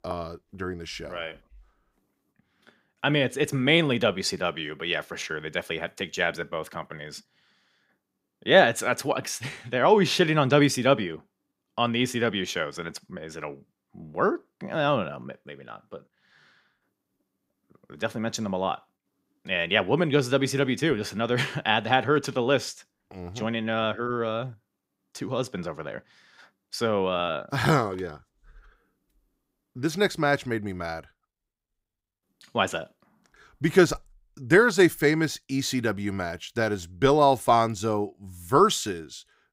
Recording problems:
none

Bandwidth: 15.5 kHz